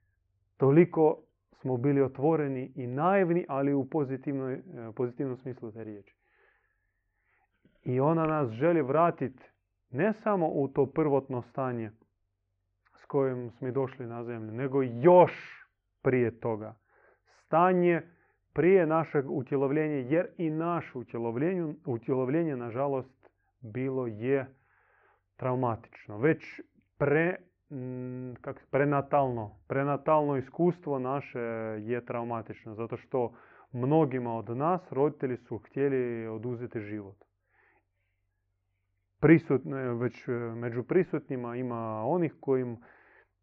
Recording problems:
muffled; very; fading above 2.5 kHz

